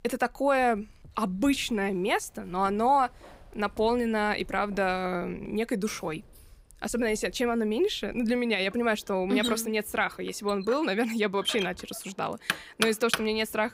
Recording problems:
household noises; loud; throughout; 7 dB below the speech

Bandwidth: 15.5 kHz